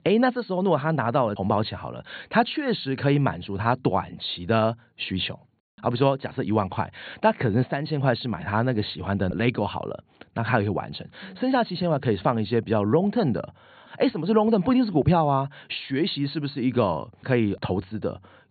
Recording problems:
high frequencies cut off; severe; nothing above 4.5 kHz

